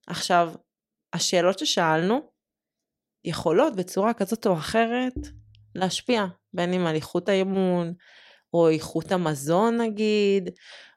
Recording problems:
none

